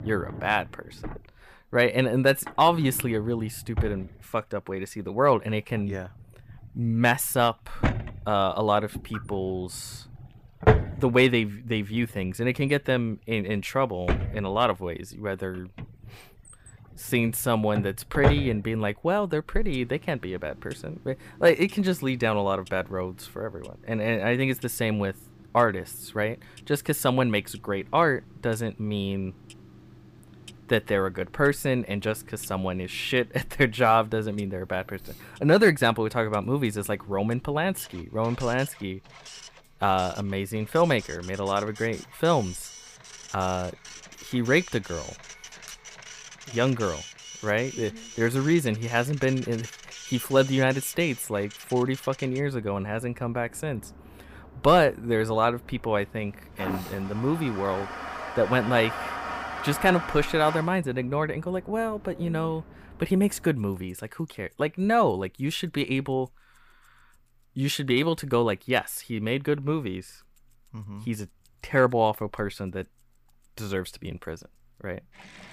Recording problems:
household noises; loud; throughout; 10 dB below the speech

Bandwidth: 15 kHz